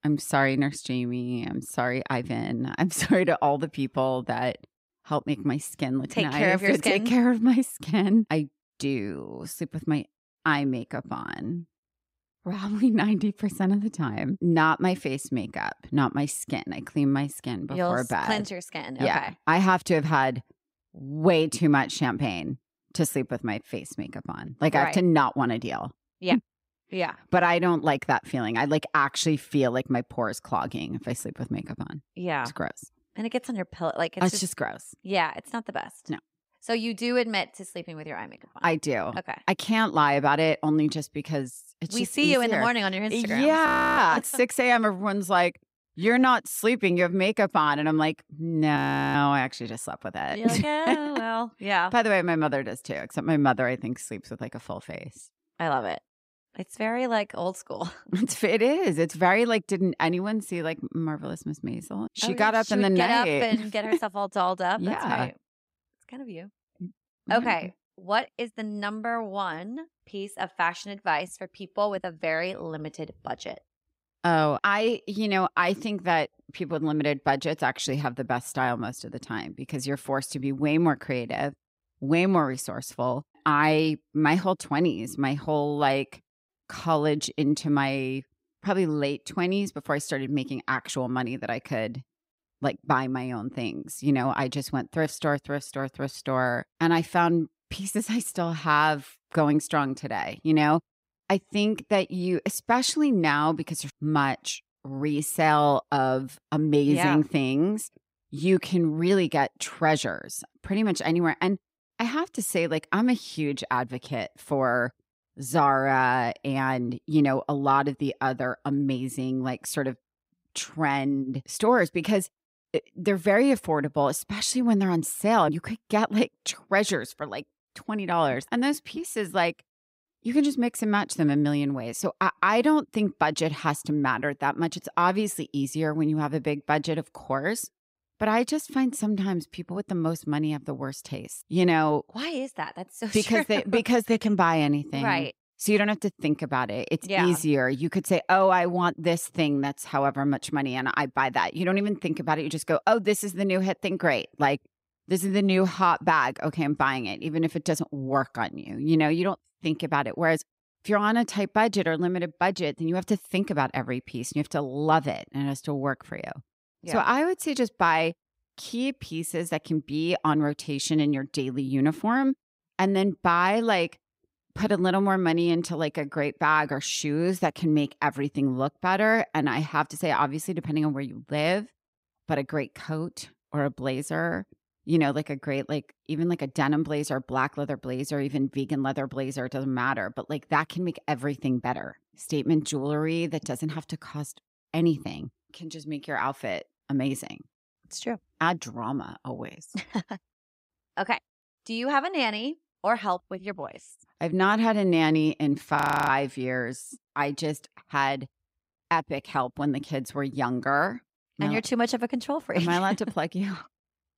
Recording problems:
audio freezing; at 44 s, at 49 s and at 3:26

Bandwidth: 15.5 kHz